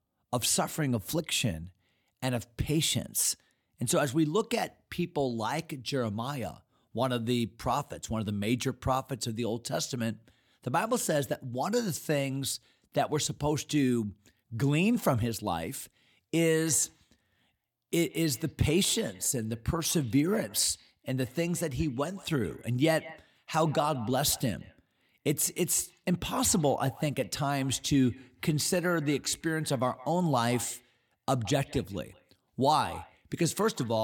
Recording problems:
echo of what is said; faint; from 17 s on; 170 ms later, 20 dB below the speech
abrupt cut into speech; at the end

